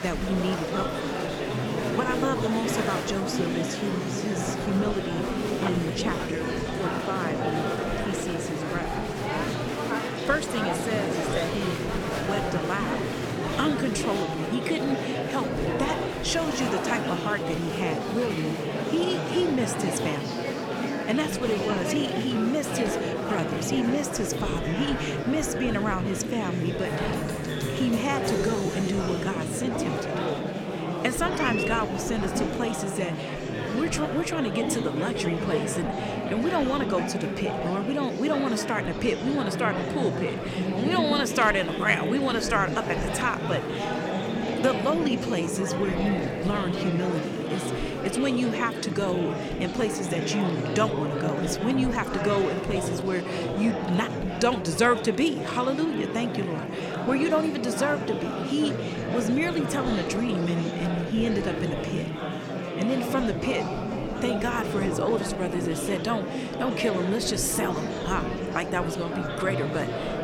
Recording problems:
murmuring crowd; loud; throughout; 1 dB below the speech

